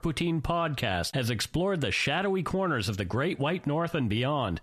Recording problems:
squashed, flat; heavily

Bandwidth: 14 kHz